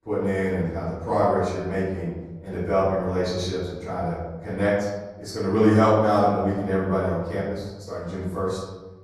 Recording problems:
off-mic speech; far
room echo; noticeable; dies away in 1.1 s

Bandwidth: 13.5 kHz